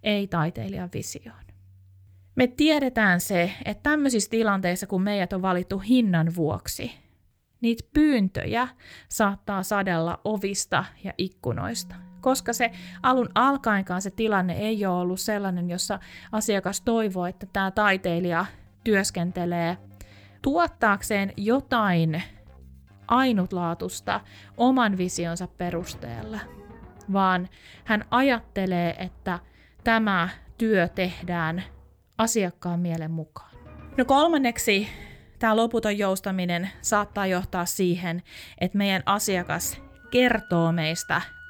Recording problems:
background music; faint; from 12 s on; 25 dB below the speech

